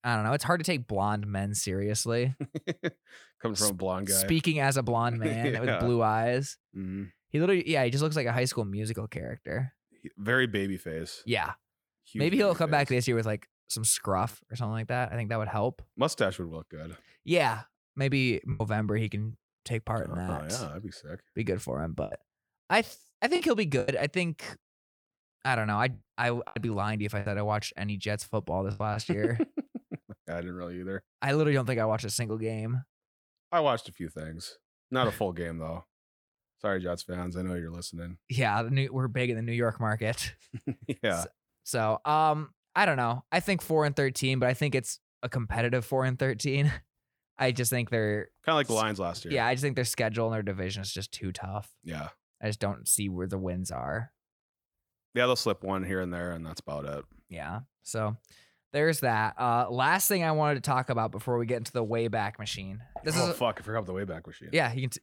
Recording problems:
choppy; very; at 19 s, from 22 to 24 s and from 26 to 29 s; 8% of the speech affected

